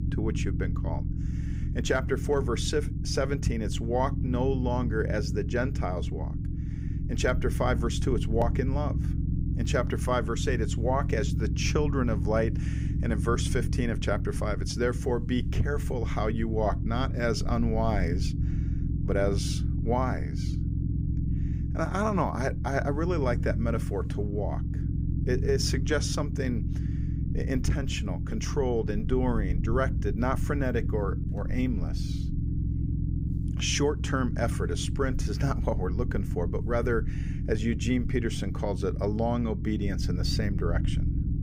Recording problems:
low rumble; noticeable; throughout; 10 dB below the speech

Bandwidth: 15.5 kHz